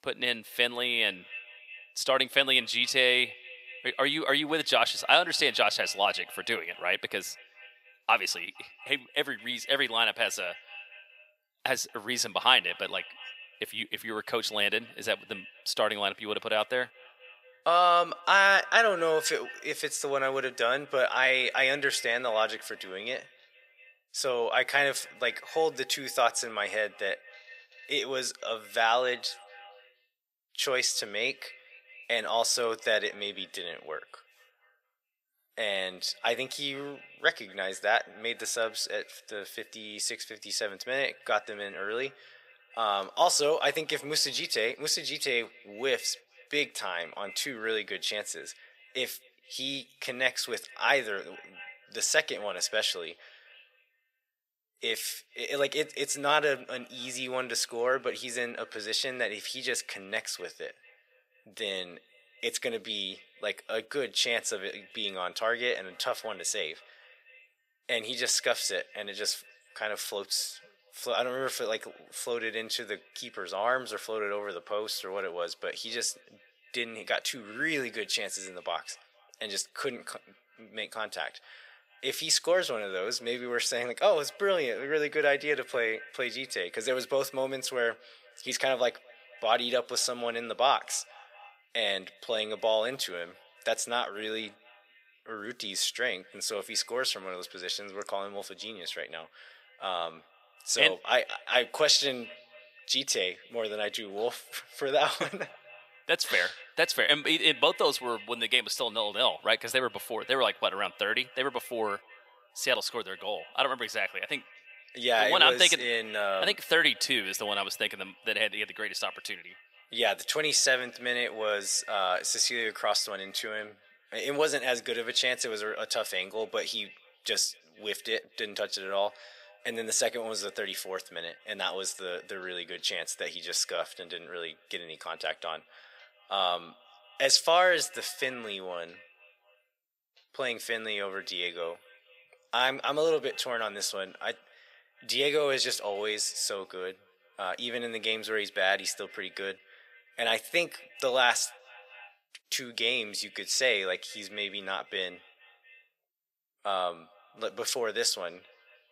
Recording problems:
thin; very; fading below 600 Hz
echo of what is said; faint; throughout; 230 ms later, 20 dB below the speech

